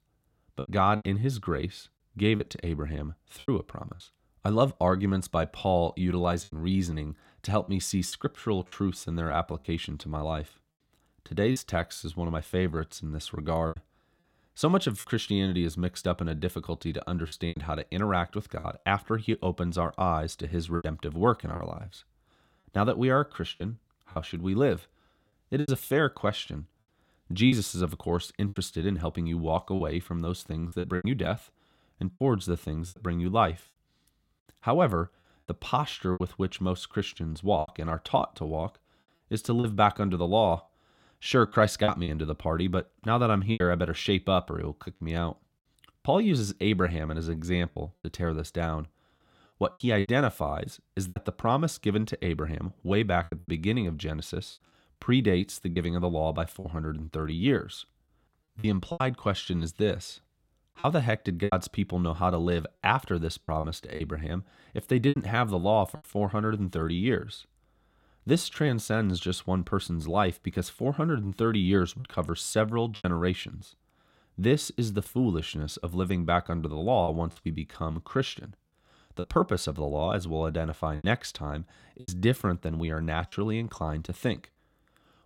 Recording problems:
choppy; very; 5% of the speech affected

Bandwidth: 16.5 kHz